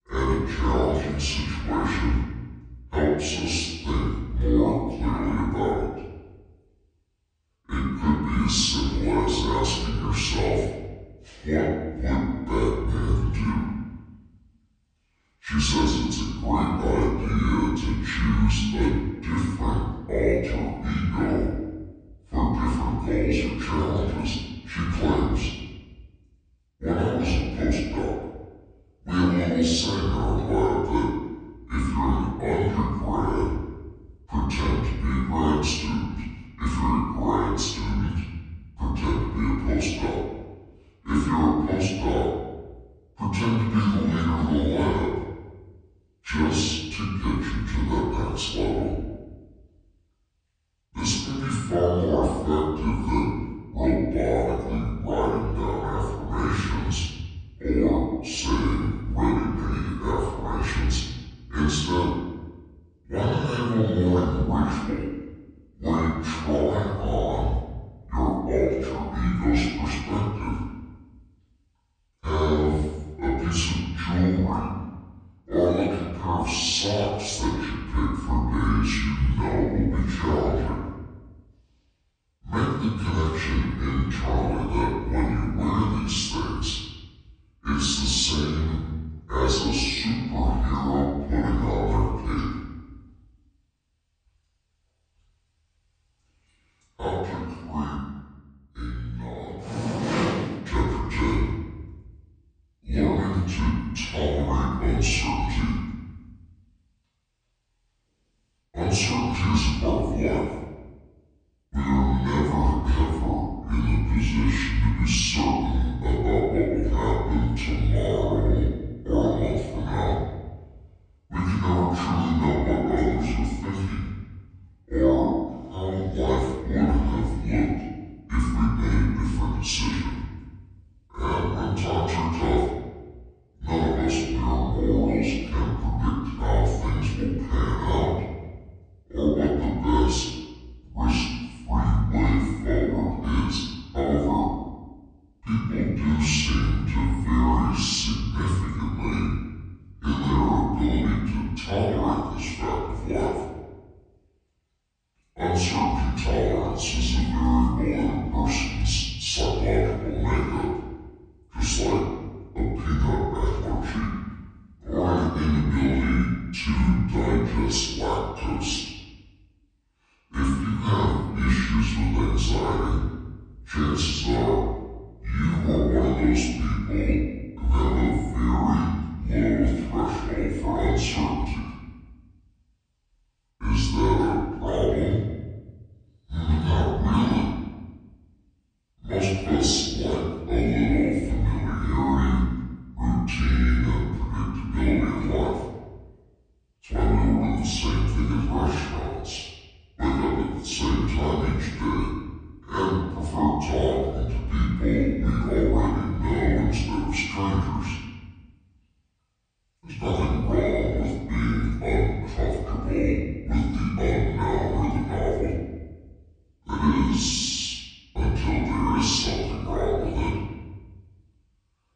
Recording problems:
off-mic speech; far
wrong speed and pitch; too slow and too low; 0.7 times normal speed
room echo; noticeable; dies away in 1.1 s

